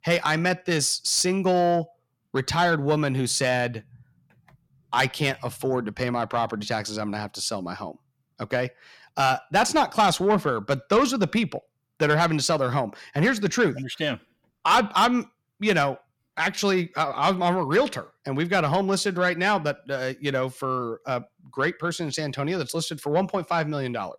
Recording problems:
distortion; slight; 10 dB below the speech

